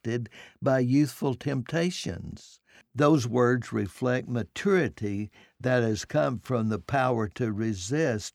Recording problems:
none

